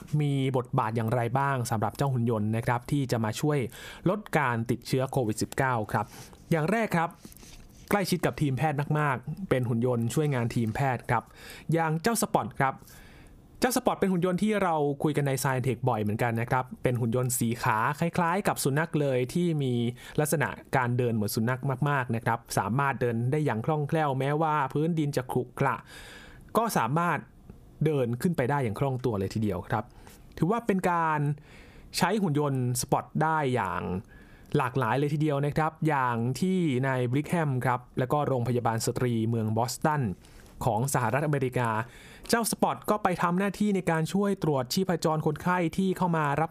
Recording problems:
squashed, flat; somewhat

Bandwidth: 15 kHz